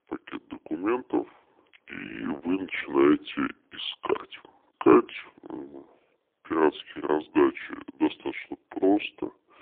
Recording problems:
phone-call audio; poor line; nothing above 3.5 kHz
wrong speed and pitch; too slow and too low; 0.7 times normal speed

